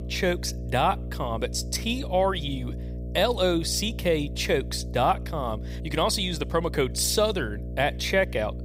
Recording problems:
electrical hum; noticeable; throughout; 60 Hz, 20 dB below the speech

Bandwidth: 15.5 kHz